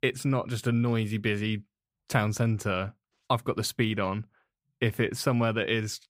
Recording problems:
none

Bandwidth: 15.5 kHz